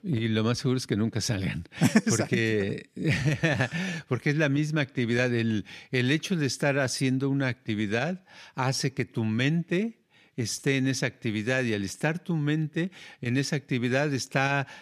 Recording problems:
none

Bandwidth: 14.5 kHz